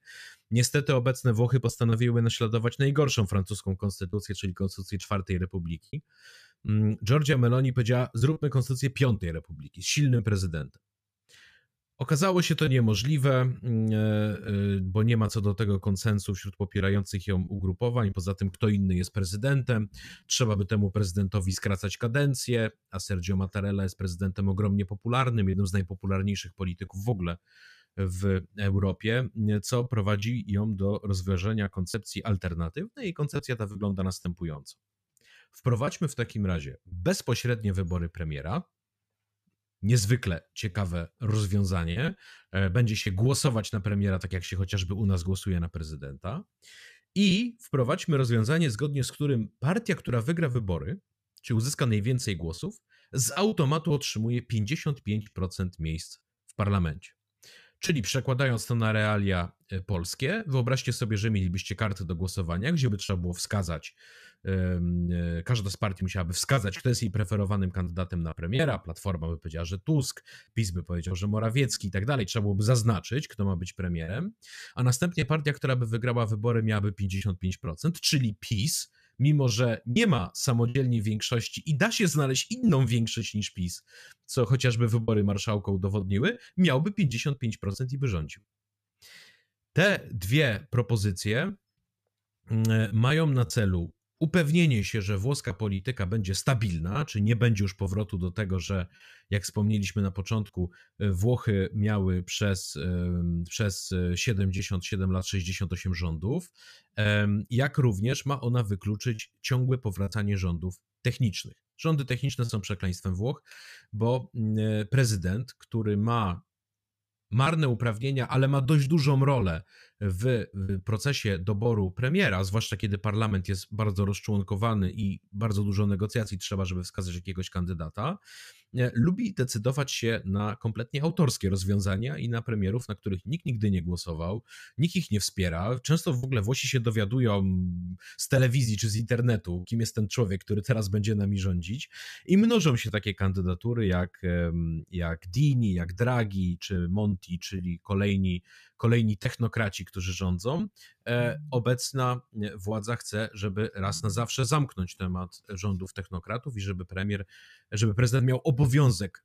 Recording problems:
choppy; occasionally; 3% of the speech affected

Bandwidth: 14.5 kHz